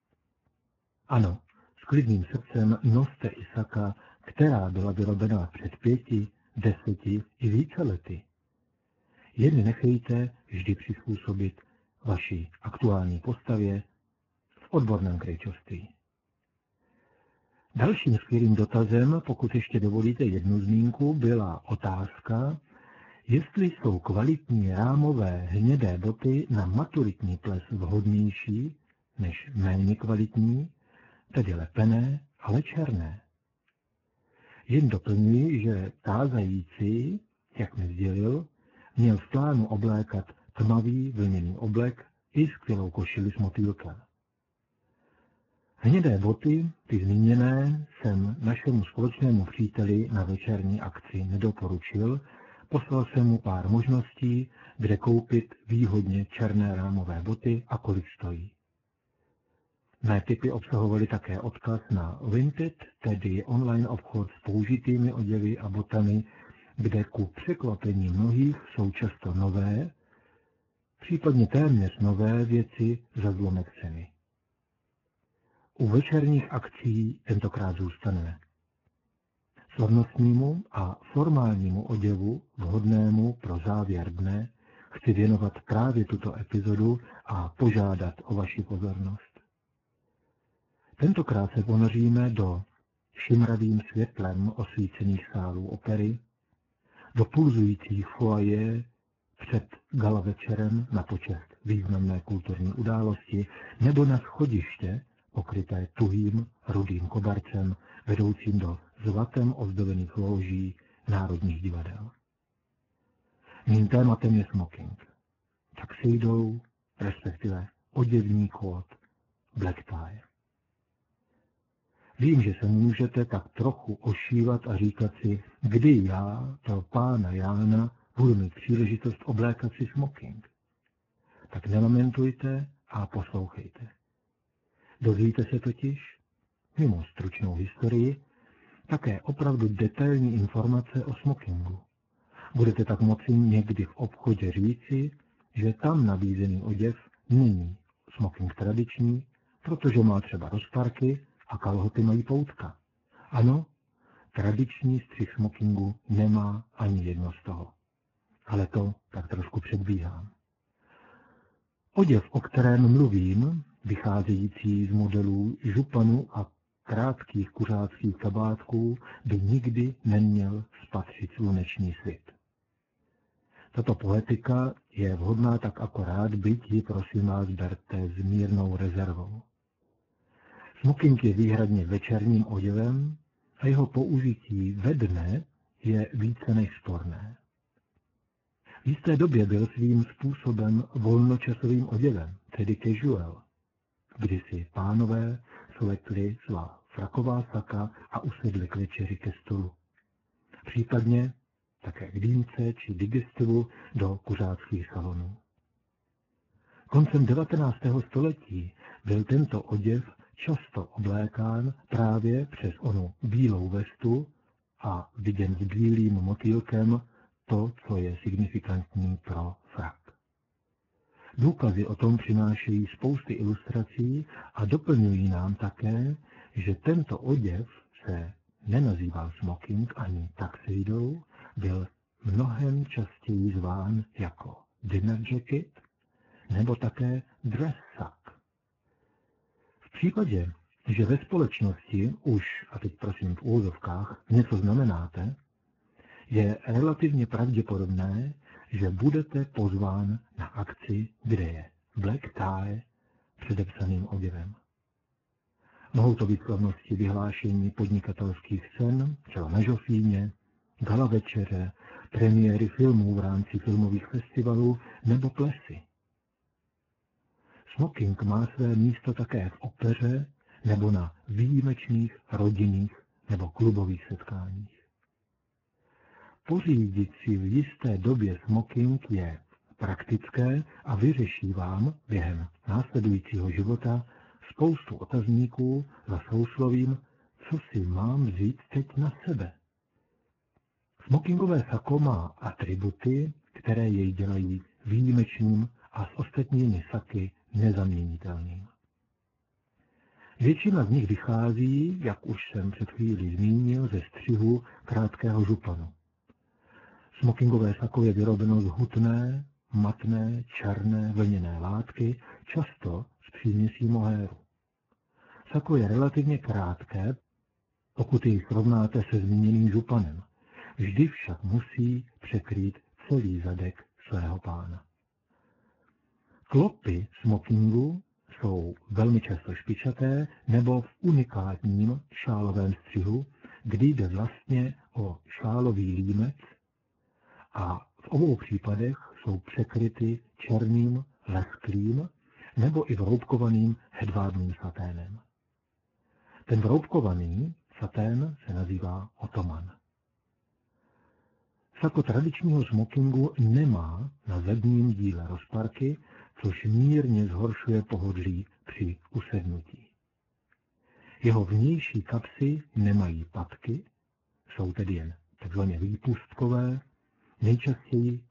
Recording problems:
garbled, watery; badly; nothing above 7 kHz

